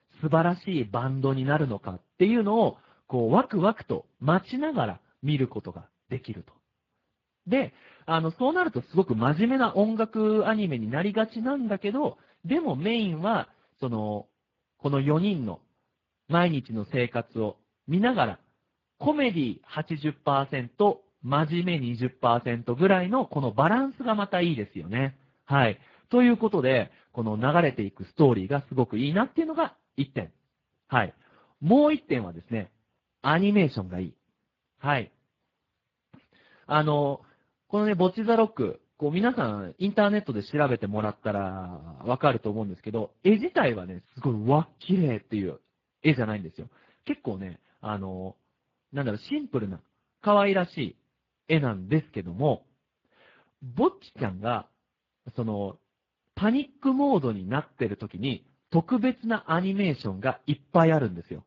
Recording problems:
garbled, watery; badly; nothing above 7 kHz

